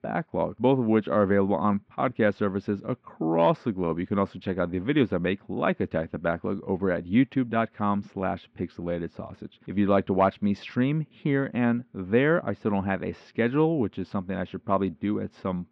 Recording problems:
muffled; very; fading above 3 kHz

